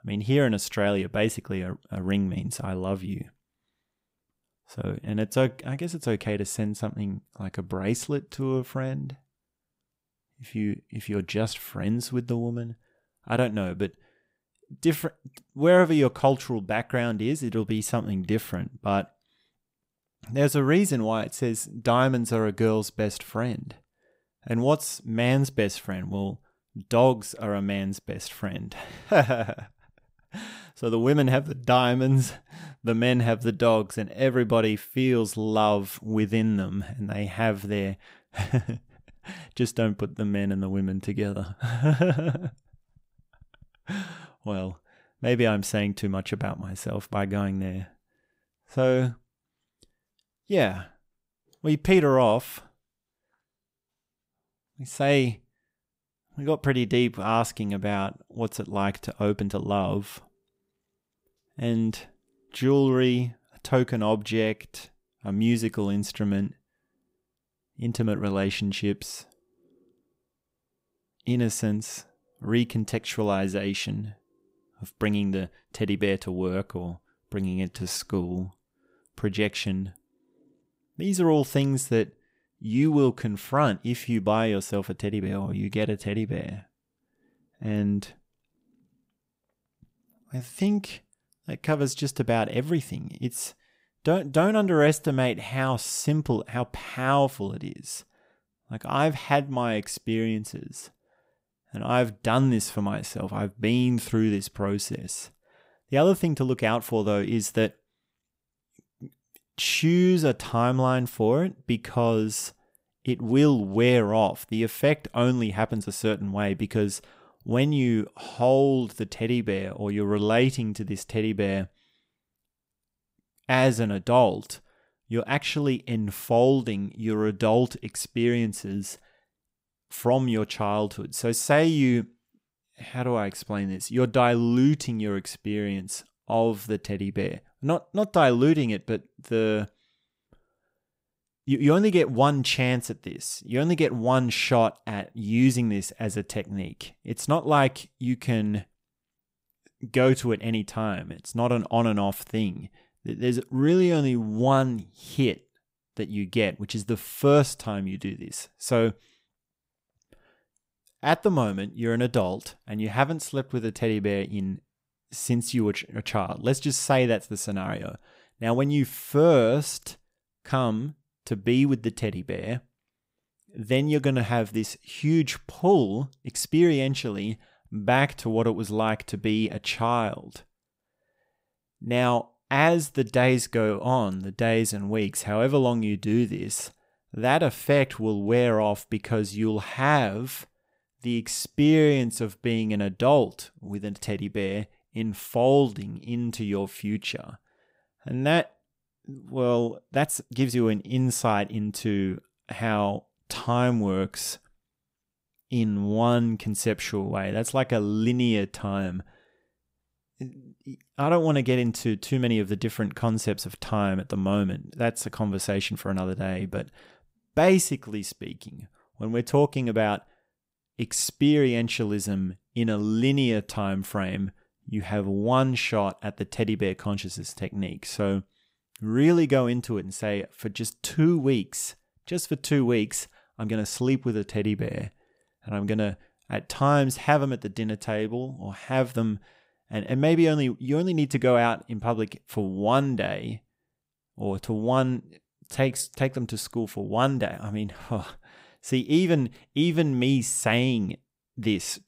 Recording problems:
uneven, jittery; strongly; from 2 s to 4:06

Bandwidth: 15.5 kHz